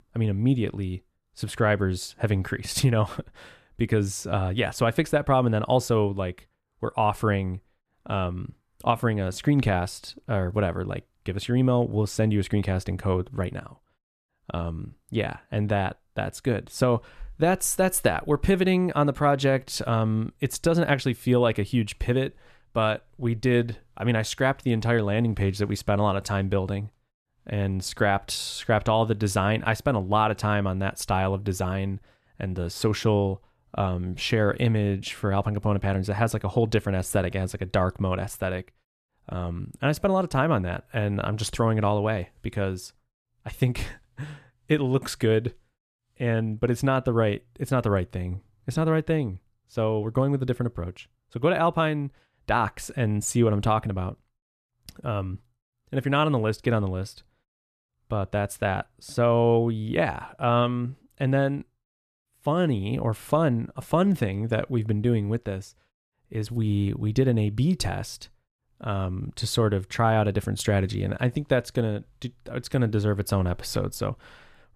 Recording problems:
none

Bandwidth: 14 kHz